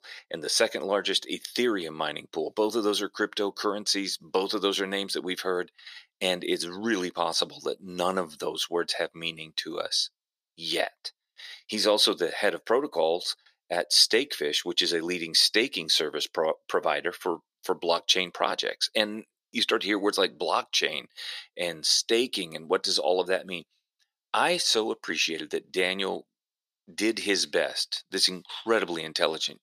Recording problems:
thin; somewhat; fading below 400 Hz

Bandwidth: 15 kHz